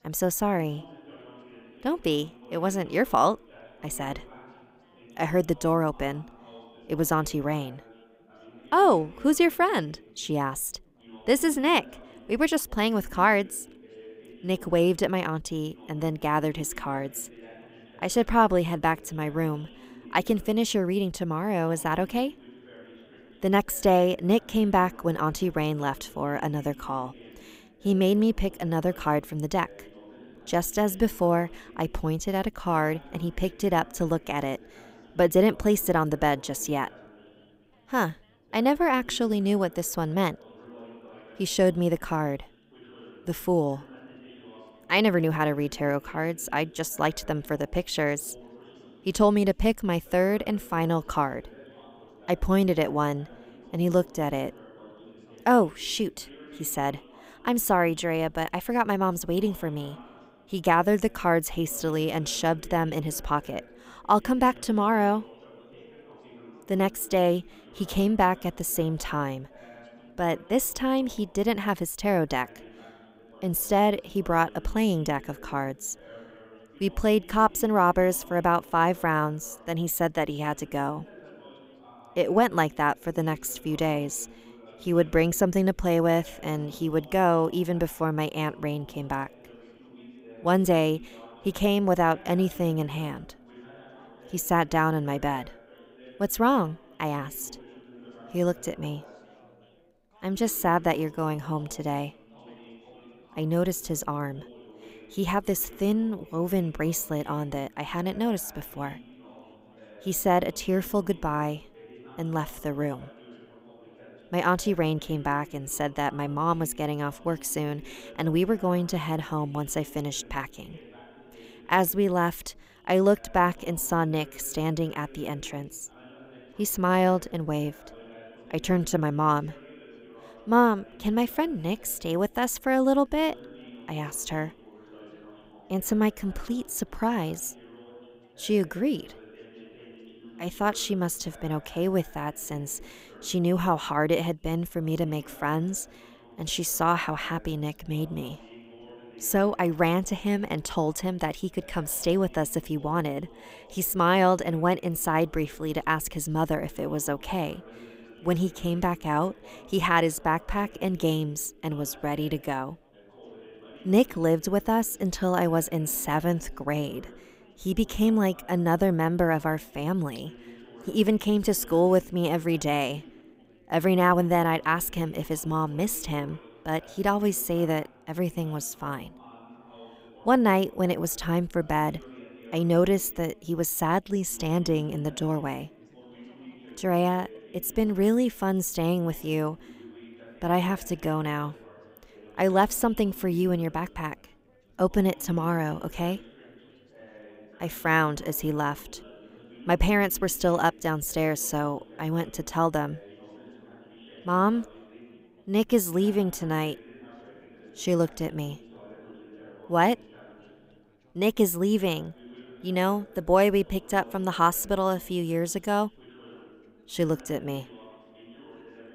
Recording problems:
background chatter; faint; throughout; 4 voices, 25 dB below the speech

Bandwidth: 15.5 kHz